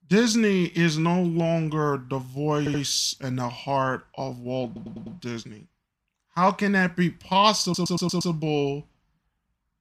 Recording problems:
audio stuttering; at 2.5 s, at 4.5 s and at 7.5 s

